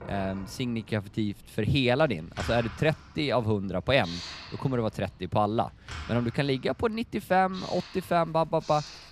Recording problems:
household noises; noticeable; throughout; 15 dB below the speech
animal sounds; faint; throughout; 30 dB below the speech

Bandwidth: 15 kHz